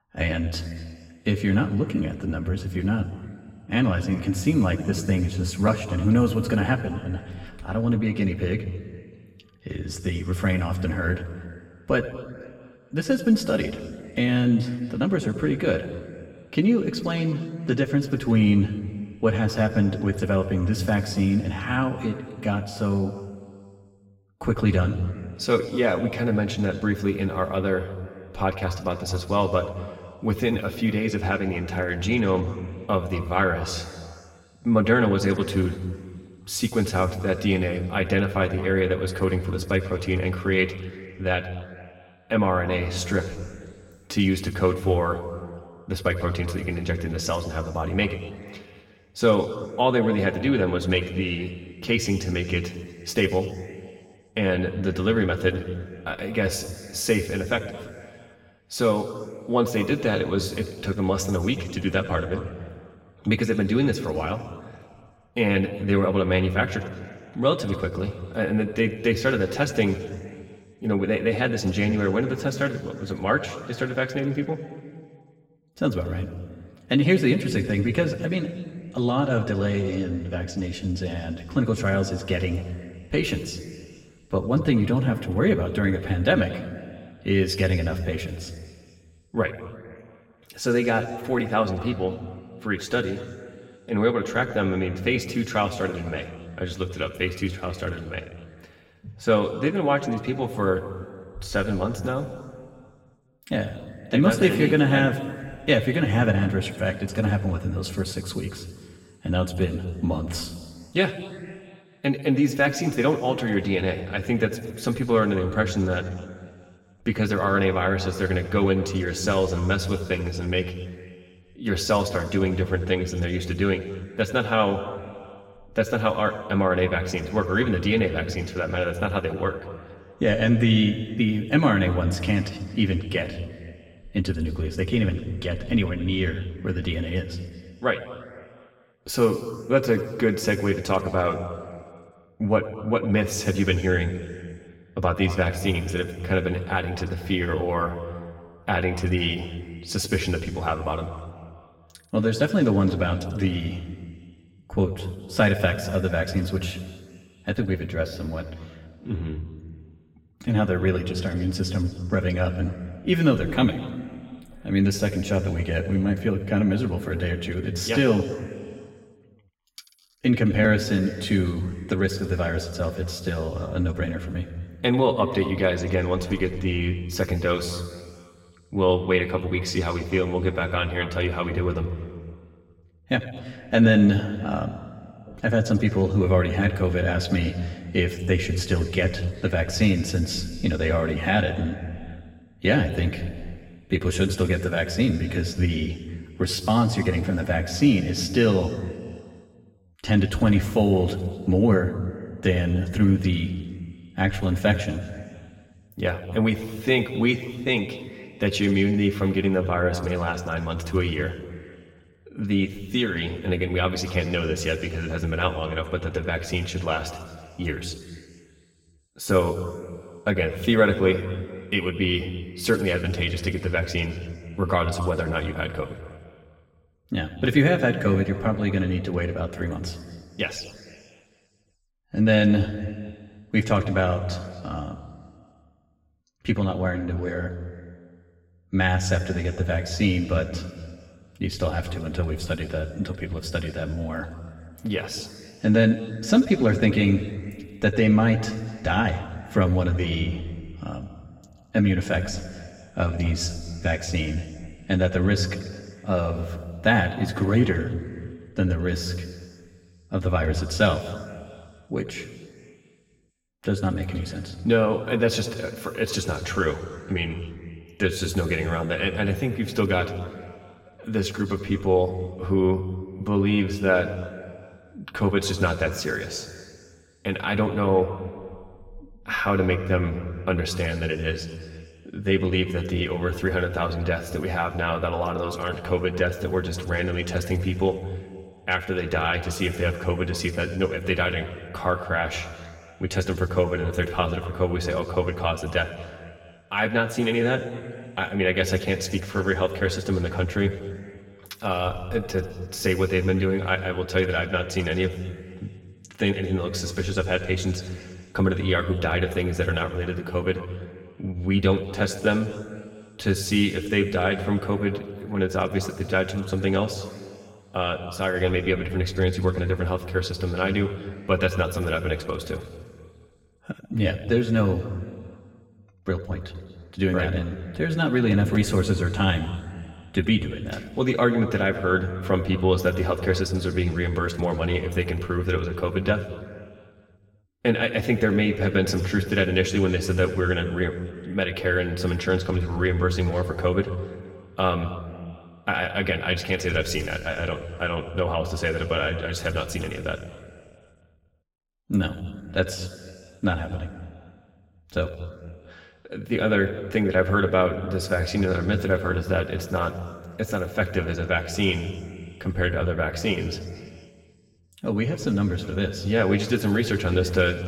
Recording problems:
room echo; slight; dies away in 2 s
off-mic speech; somewhat distant

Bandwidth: 16.5 kHz